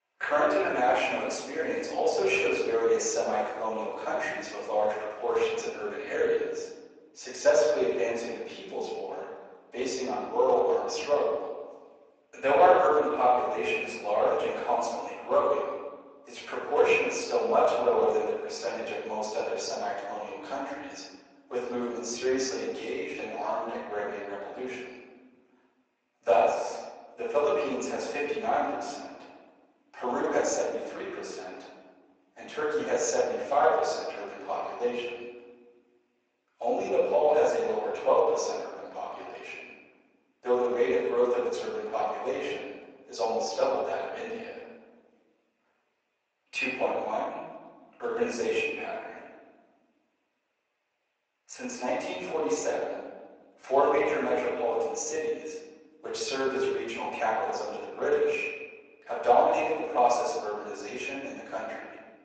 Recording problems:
off-mic speech; far
thin; very; fading below 400 Hz
room echo; noticeable; dies away in 1.3 s
garbled, watery; slightly

